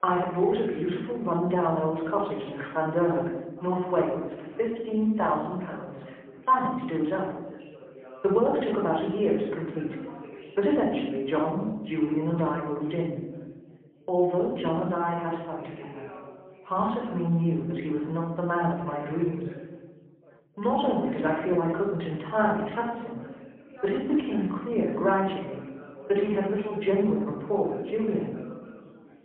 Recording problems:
phone-call audio; poor line
room echo; noticeable; dies away in 1 s
off-mic speech; somewhat distant
background chatter; noticeable; throughout; 4 voices, 20 dB below the speech

